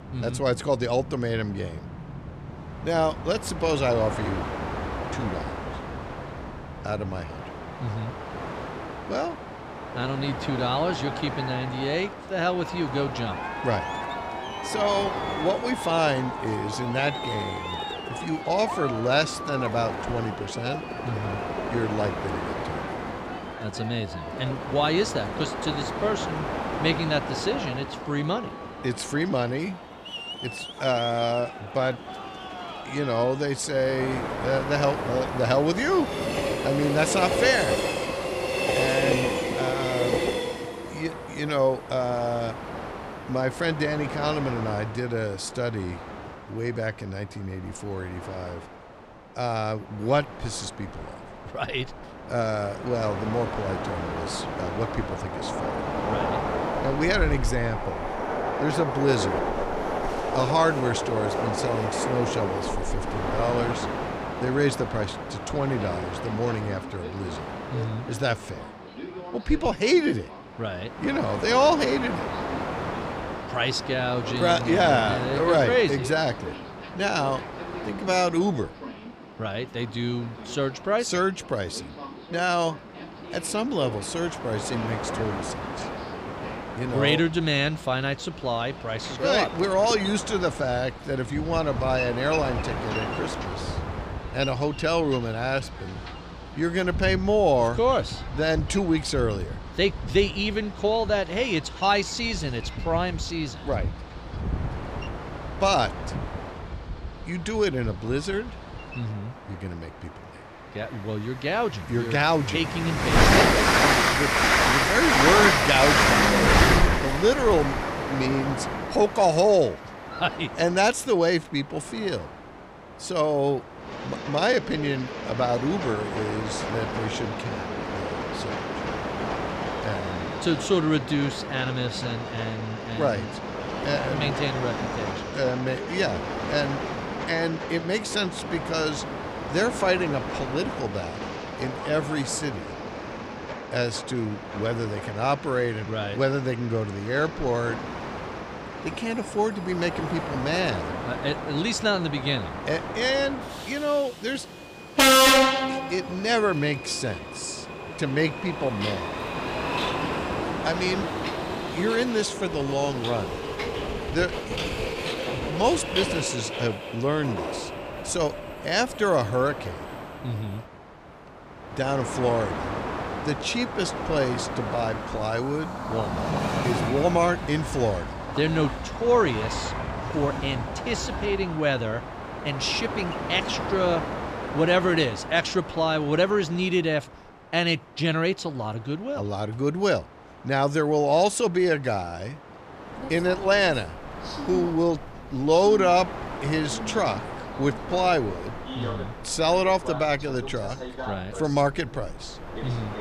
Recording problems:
train or aircraft noise; loud; throughout; 3 dB below the speech

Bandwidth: 15 kHz